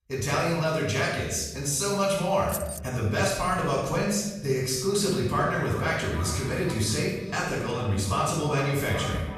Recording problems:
off-mic speech; far
echo of what is said; noticeable; from 5.5 s on; 410 ms later, 15 dB below the speech
room echo; noticeable; dies away in 1 s
jangling keys; noticeable; at 2.5 s; peak 8 dB below the speech

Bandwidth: 14.5 kHz